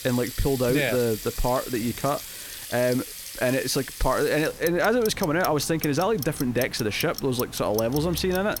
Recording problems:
household noises; noticeable; throughout; 10 dB below the speech

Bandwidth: 17.5 kHz